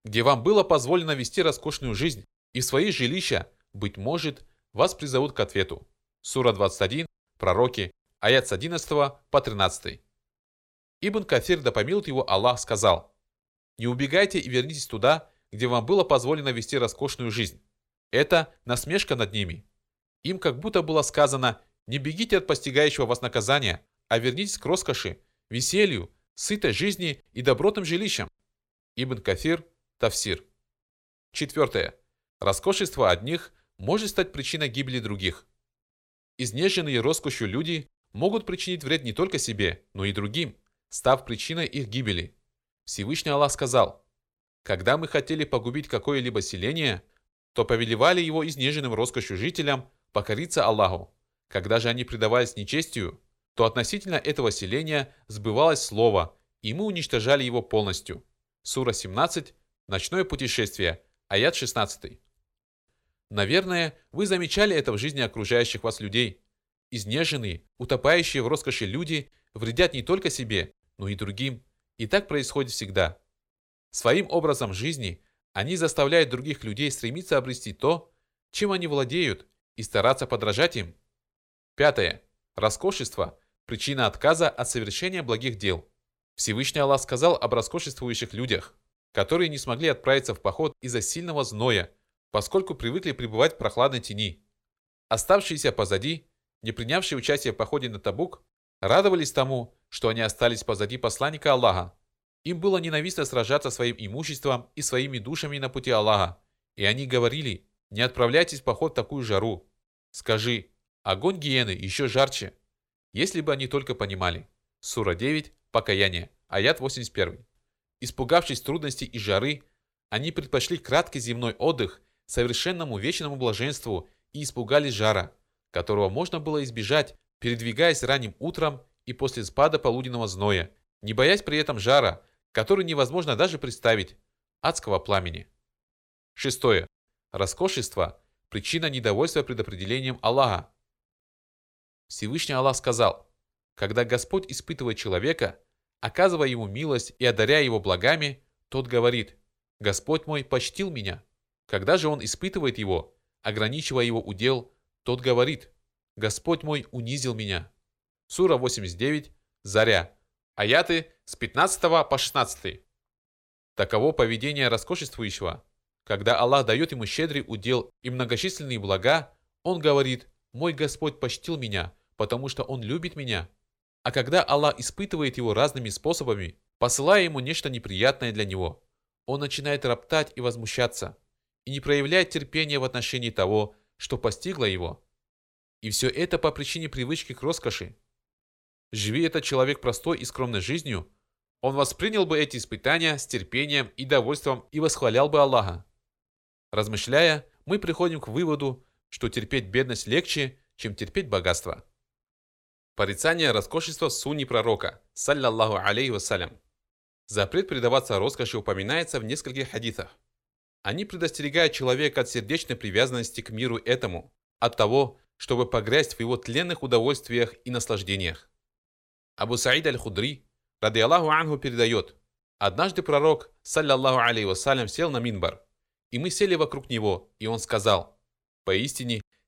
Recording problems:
none

